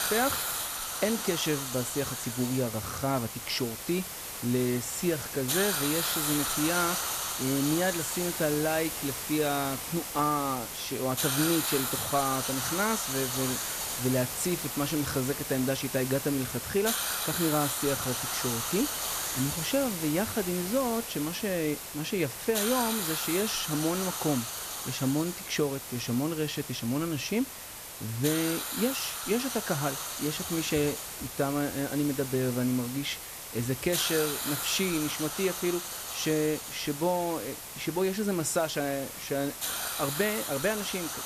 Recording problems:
hiss; loud; throughout; 2 dB below the speech

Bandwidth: 14.5 kHz